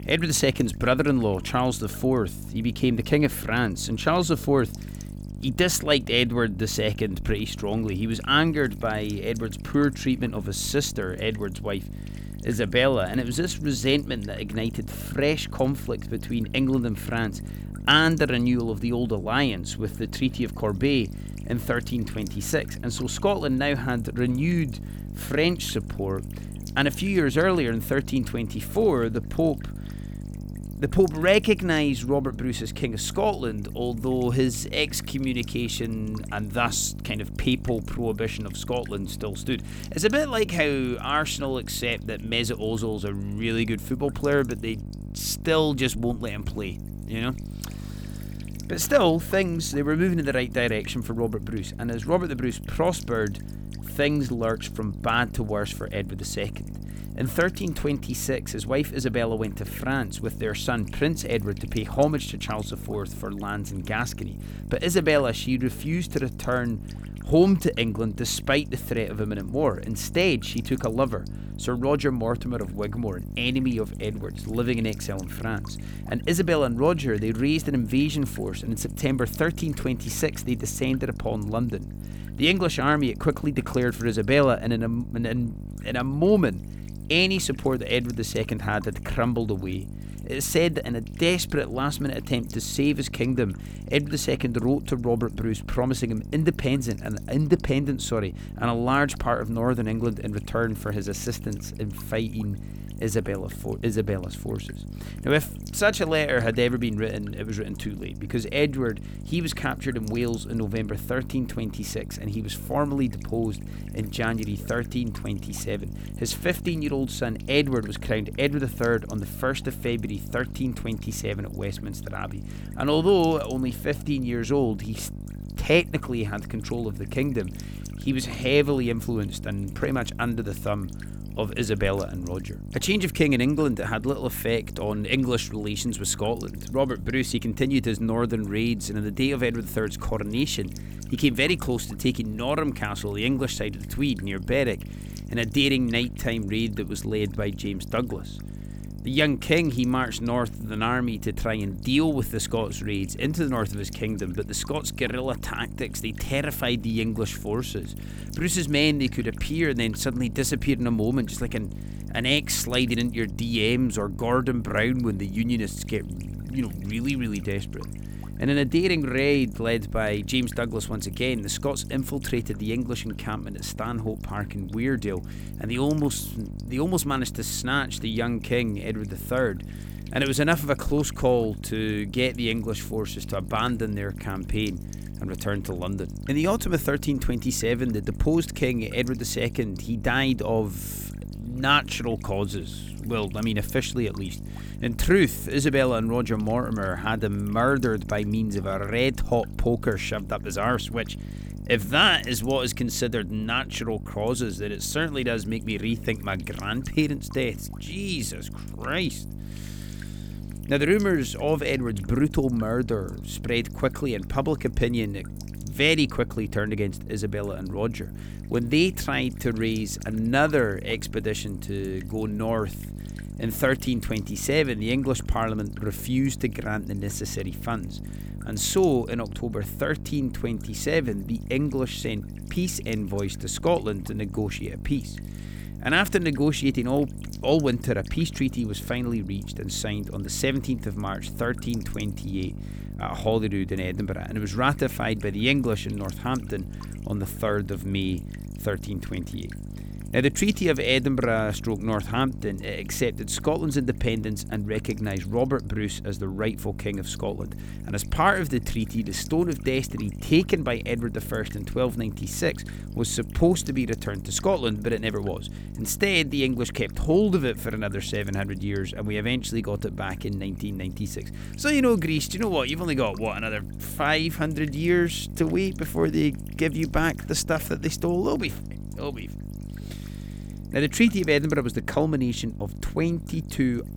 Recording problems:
electrical hum; noticeable; throughout; 50 Hz, 20 dB below the speech

